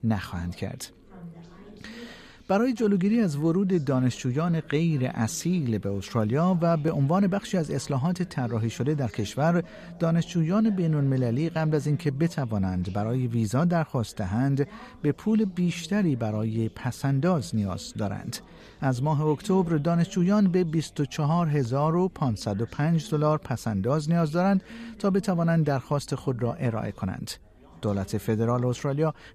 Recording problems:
background chatter; faint; throughout; 4 voices, 20 dB below the speech

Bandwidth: 14 kHz